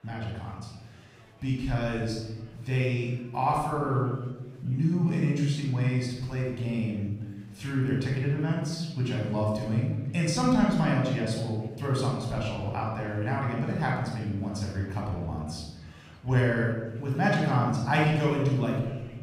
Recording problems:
off-mic speech; far
room echo; noticeable; dies away in 1.1 s
murmuring crowd; faint; throughout; 30 dB below the speech

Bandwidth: 15.5 kHz